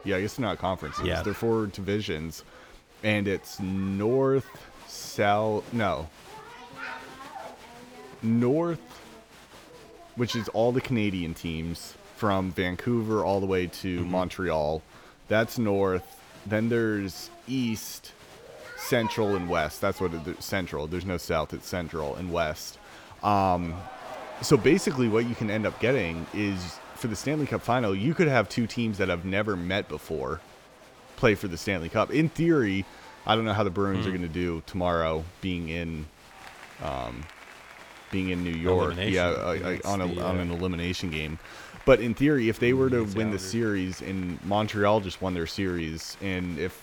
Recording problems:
crowd noise; noticeable; throughout; 20 dB below the speech

